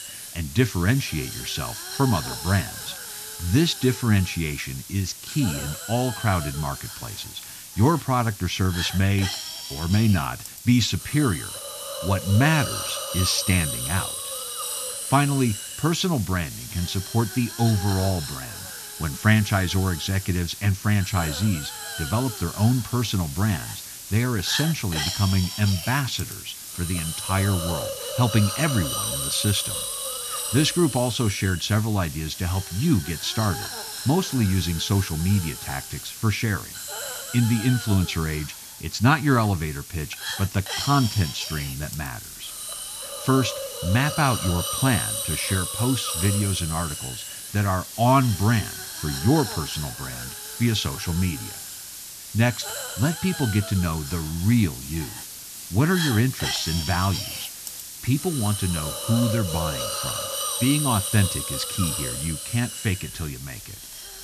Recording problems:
high frequencies cut off; noticeable; nothing above 8 kHz
hiss; loud; throughout; 6 dB below the speech

